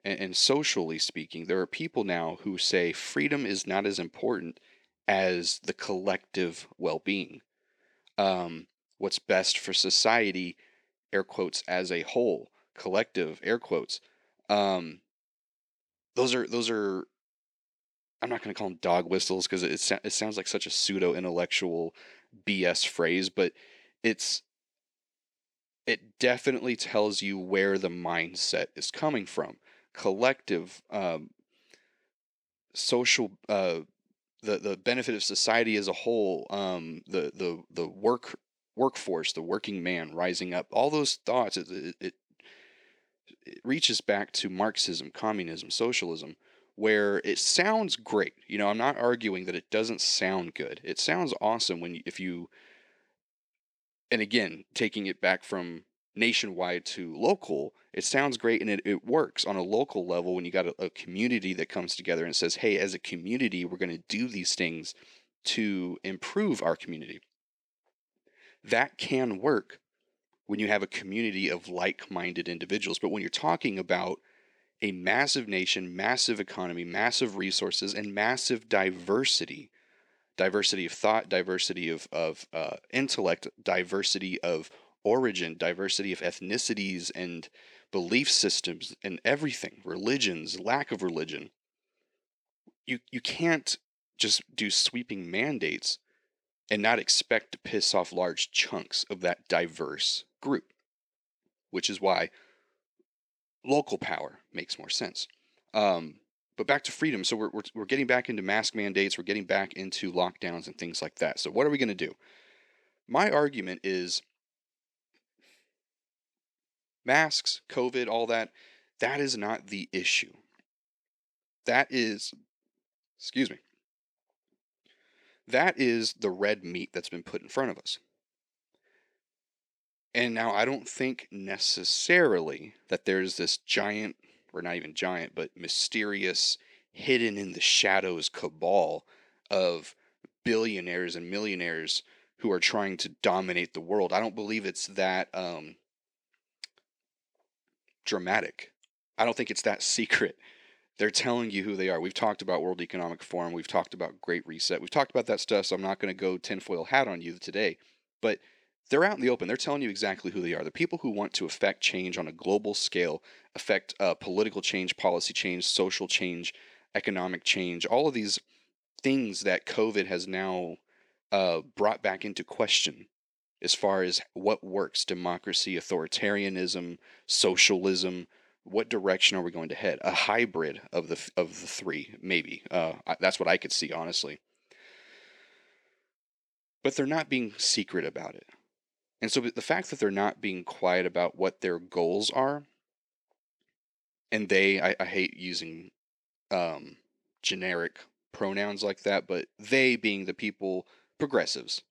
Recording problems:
thin; very slightly; fading below 300 Hz

